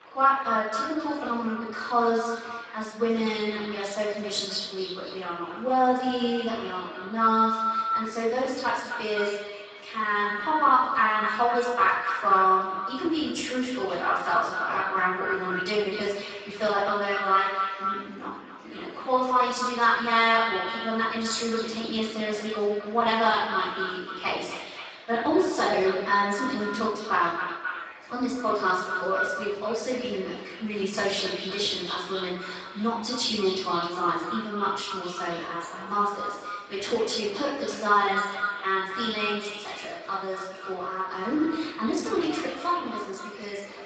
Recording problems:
echo of what is said; strong; throughout; 260 ms later, 7 dB below the speech
off-mic speech; far
garbled, watery; badly; nothing above 7.5 kHz
room echo; noticeable; dies away in 0.7 s
thin; somewhat; fading below 350 Hz
murmuring crowd; noticeable; throughout; 20 dB below the speech

